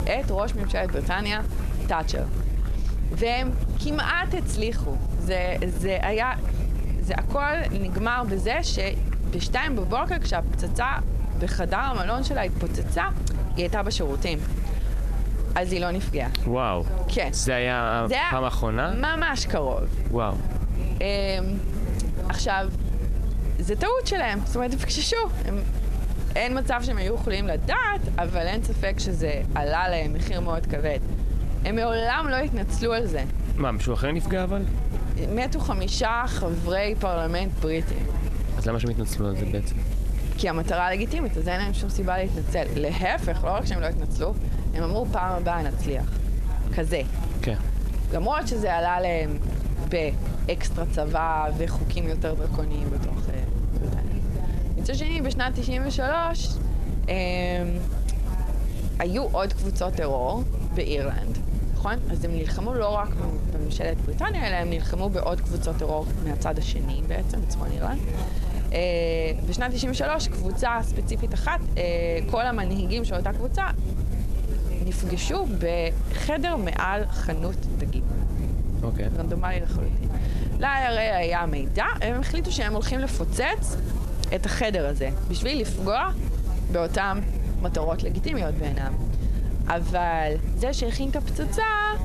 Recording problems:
squashed, flat; somewhat
murmuring crowd; noticeable; throughout; 15 dB below the speech
low rumble; noticeable; throughout; 15 dB below the speech
hiss; faint; throughout; 25 dB below the speech

